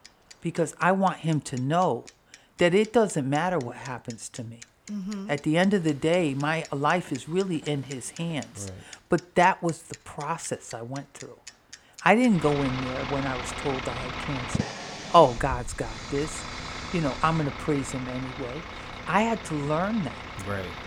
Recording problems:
traffic noise; noticeable; throughout; 10 dB below the speech
train or aircraft noise; faint; throughout; 30 dB below the speech

